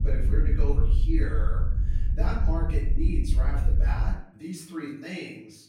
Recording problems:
off-mic speech; far
room echo; noticeable; dies away in 0.6 s
wind noise on the microphone; heavy; until 4 s; 8 dB below the speech

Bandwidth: 16.5 kHz